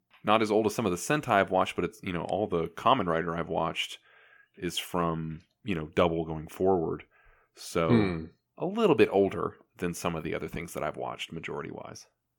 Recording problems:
none

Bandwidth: 18 kHz